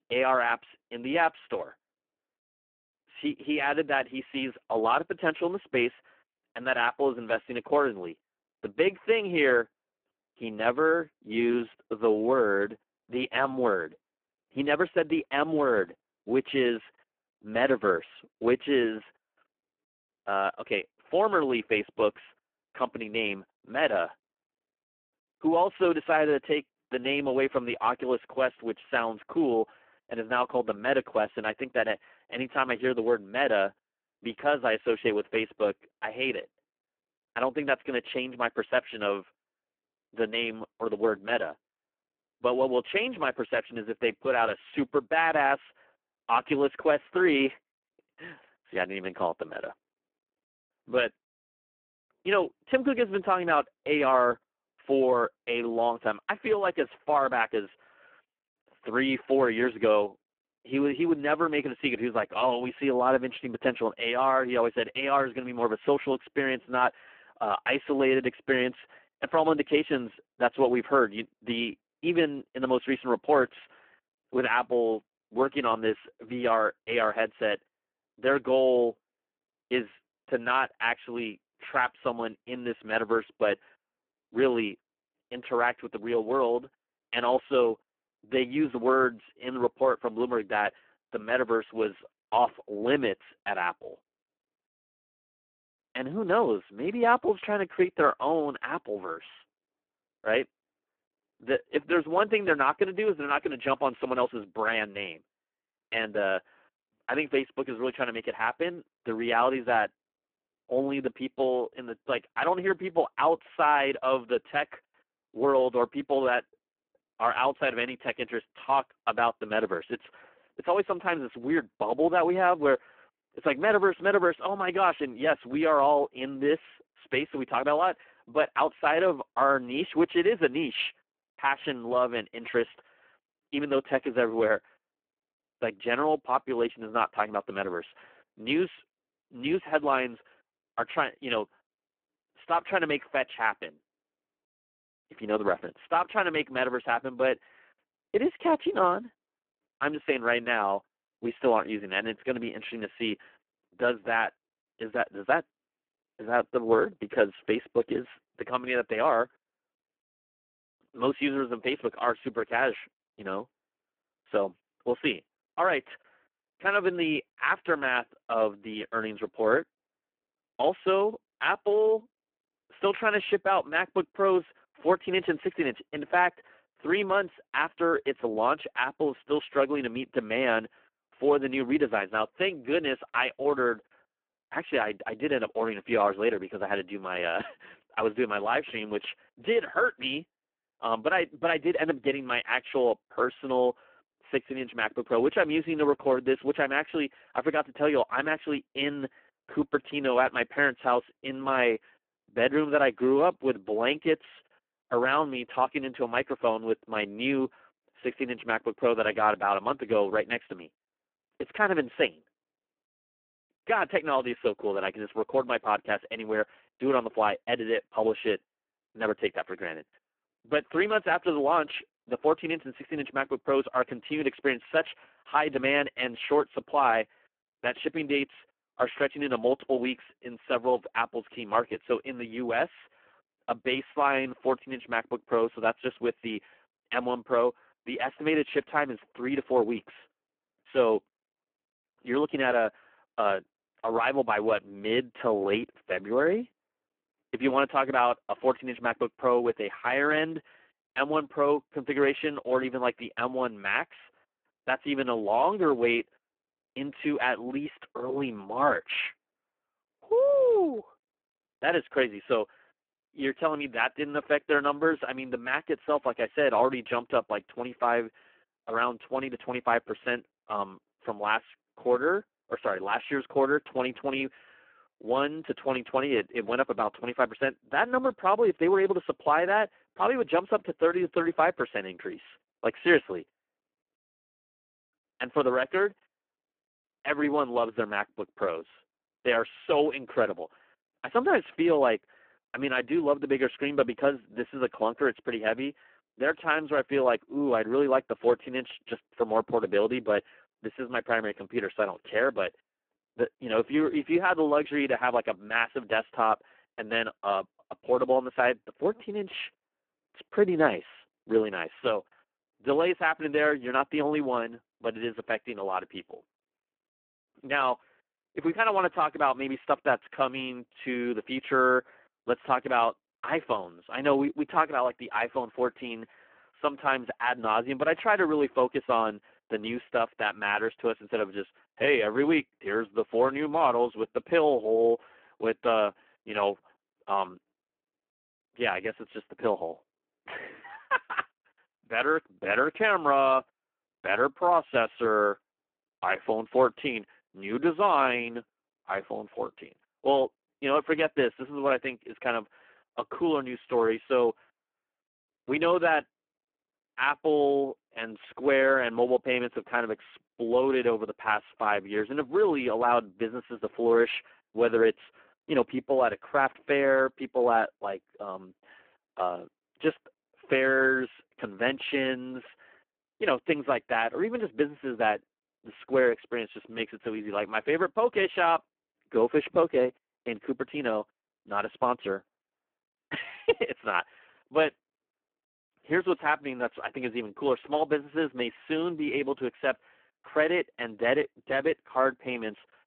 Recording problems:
phone-call audio; poor line

